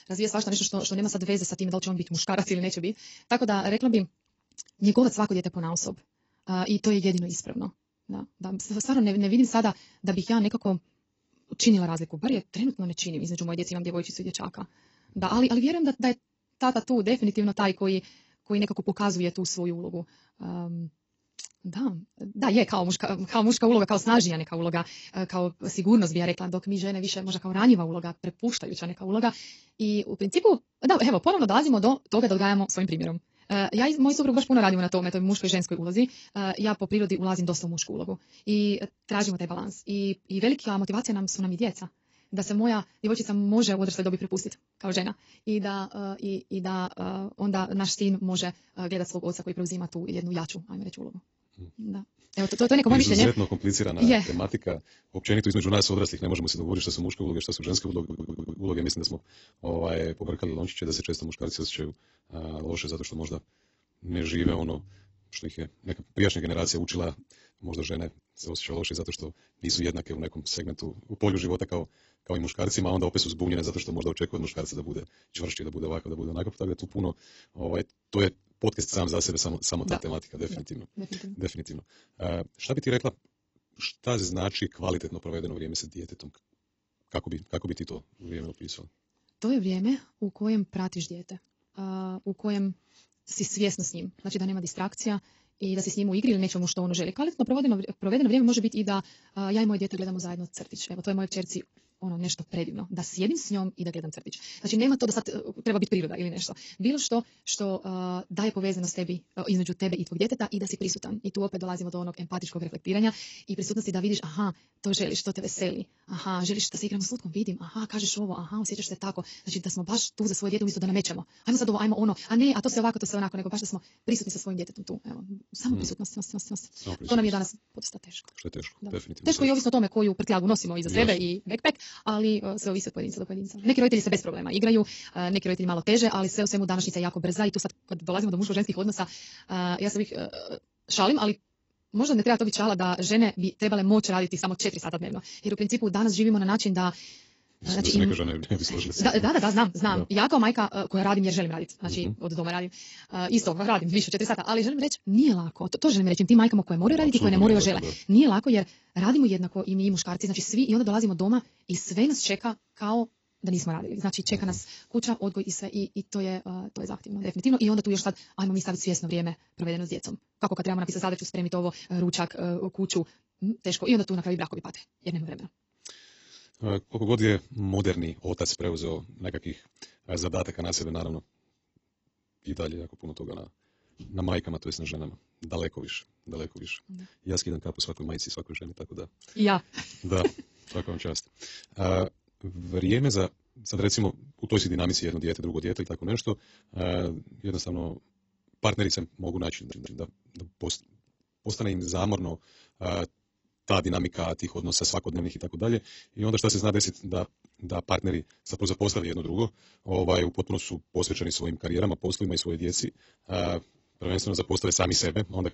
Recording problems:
garbled, watery; badly; nothing above 7.5 kHz
wrong speed, natural pitch; too fast; 1.5 times normal speed
audio stuttering; at 58 s, at 2:06 and at 3:20

